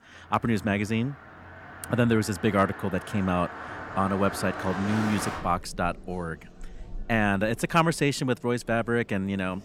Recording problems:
traffic noise; noticeable; throughout; 10 dB below the speech

